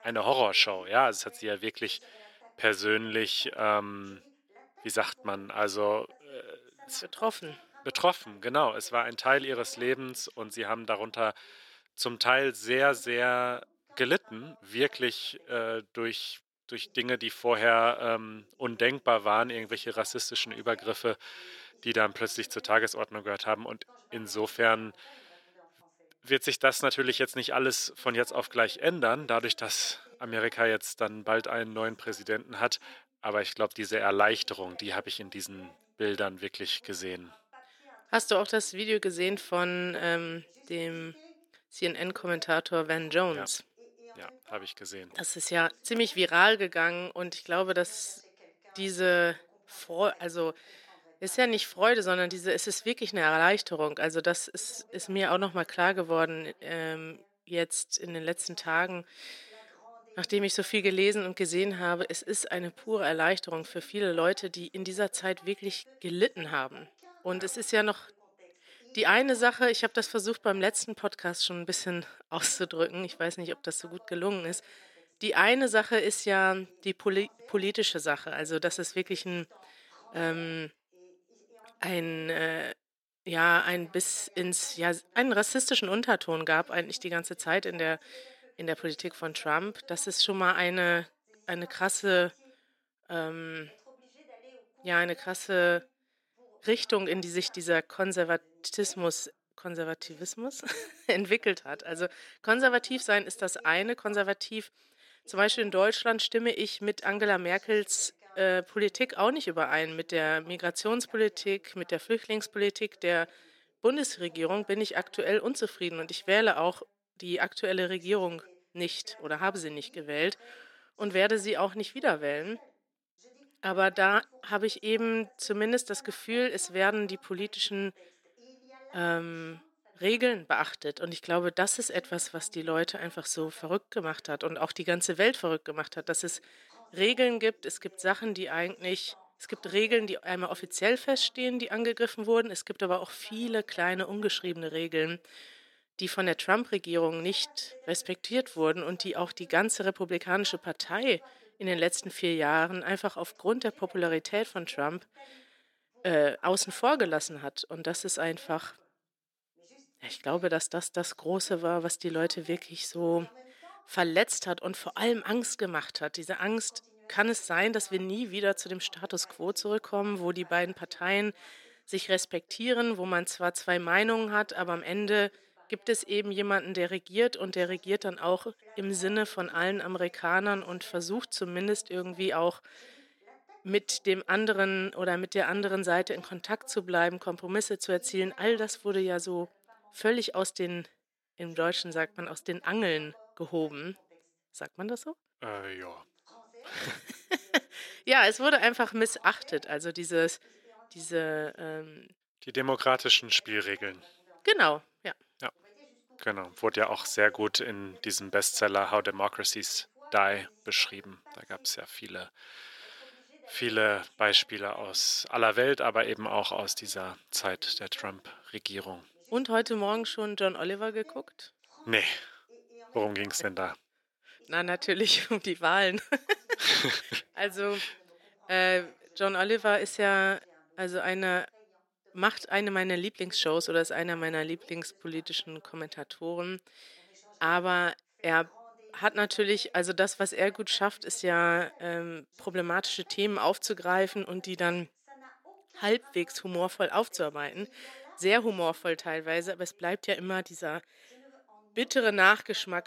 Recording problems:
thin; somewhat; fading below 400 Hz
voice in the background; faint; throughout; 30 dB below the speech

